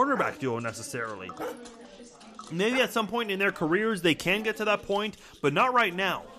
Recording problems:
household noises; faint; throughout; 25 dB below the speech
chatter from many people; faint; throughout; 25 dB below the speech
abrupt cut into speech; at the start
dog barking; faint; until 3 s; peak 10 dB below the speech

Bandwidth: 14.5 kHz